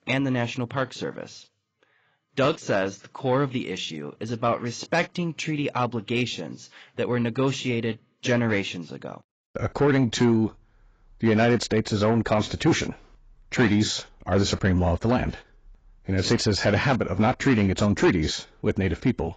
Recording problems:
garbled, watery; badly; nothing above 7.5 kHz
distortion; slight; 10 dB below the speech

